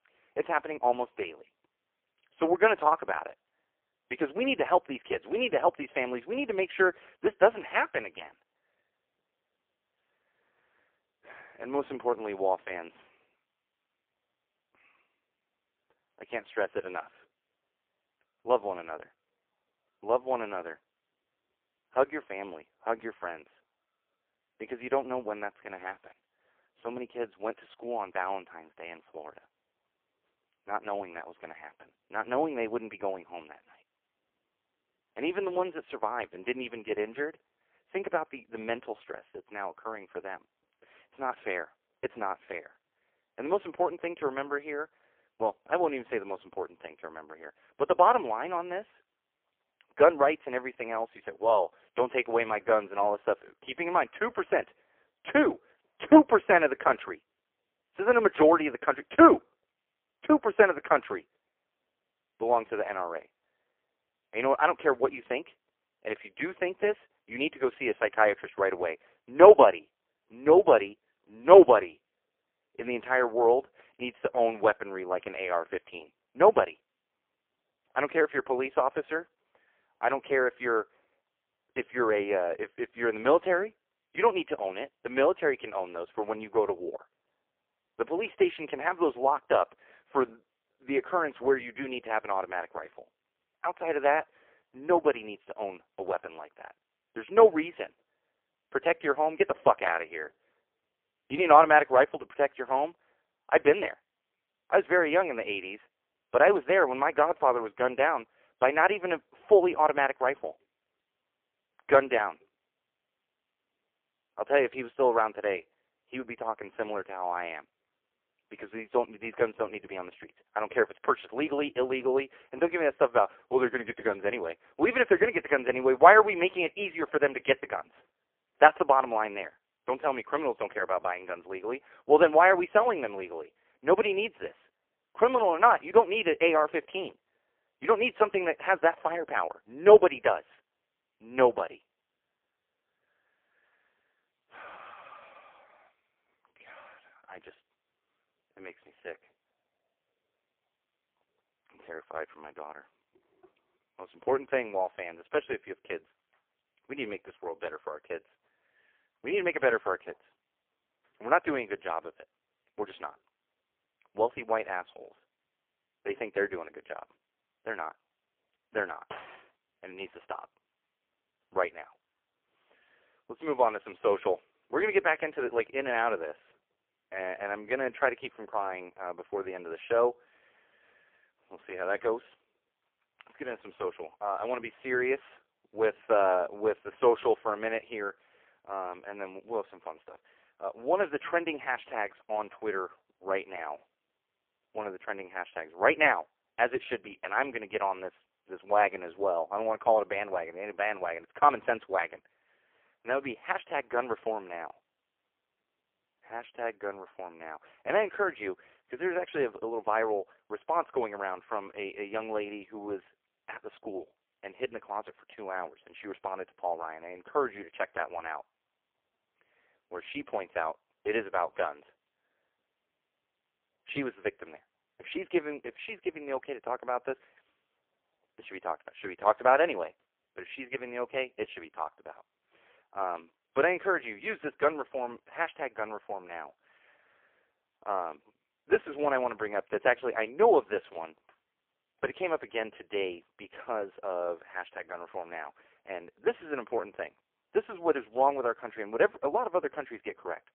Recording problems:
phone-call audio; poor line
clattering dishes; faint; at 2:49; peak 15 dB below the speech

